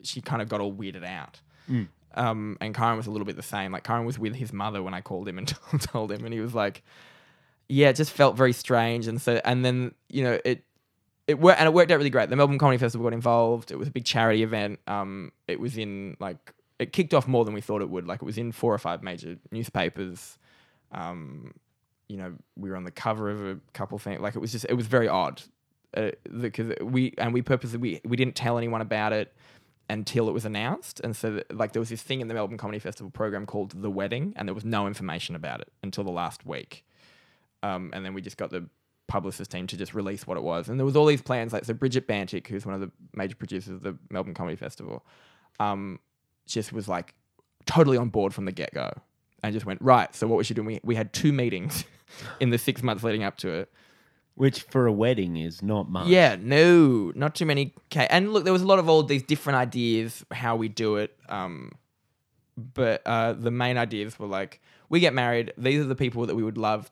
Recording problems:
none

